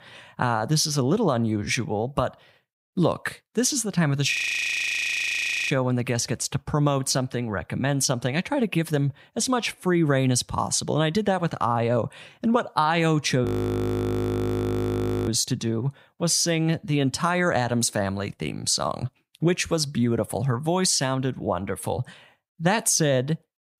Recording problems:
audio freezing; at 4.5 s for 1.5 s and at 13 s for 2 s

